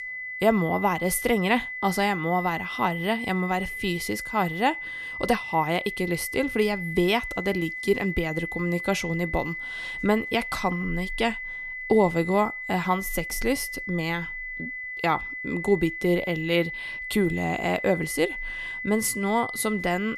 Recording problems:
high-pitched whine; loud; throughout; 2 kHz, 6 dB below the speech

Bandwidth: 14 kHz